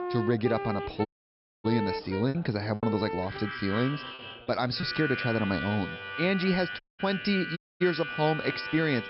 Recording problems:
high frequencies cut off; noticeable; nothing above 5.5 kHz
background music; loud; throughout; 6 dB below the speech
background chatter; faint; throughout; 3 voices, 20 dB below the speech
choppy; occasionally; 2% of the speech affected
audio cutting out; at 1 s for 0.5 s, at 7 s and at 7.5 s

